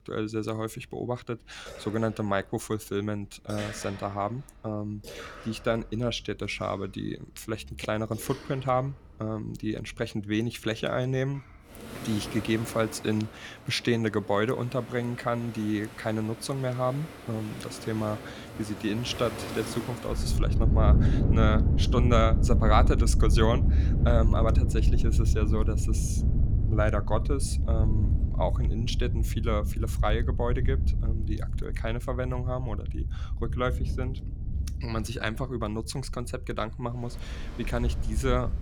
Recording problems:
rain or running water; very loud; throughout; 3 dB above the speech

